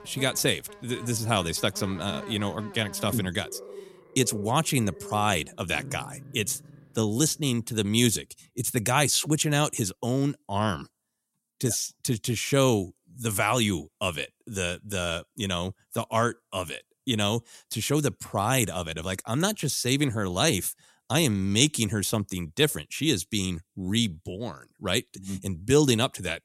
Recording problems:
animal sounds; noticeable; until 7.5 s; 15 dB below the speech

